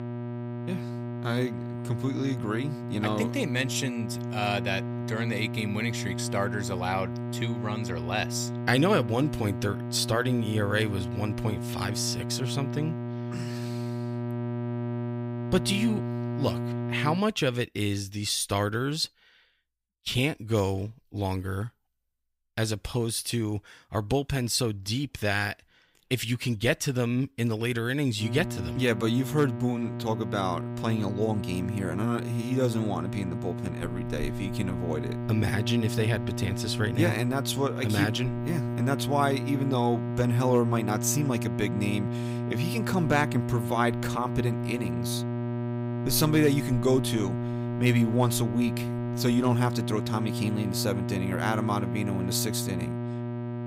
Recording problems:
electrical hum; loud; until 17 s and from 28 s on; 60 Hz, 8 dB below the speech

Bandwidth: 15.5 kHz